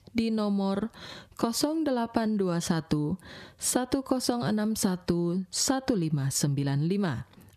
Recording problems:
squashed, flat; somewhat

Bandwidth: 14 kHz